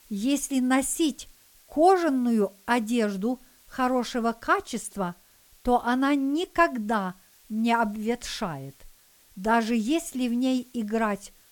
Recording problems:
hiss; faint; throughout; 30 dB below the speech

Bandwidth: 18 kHz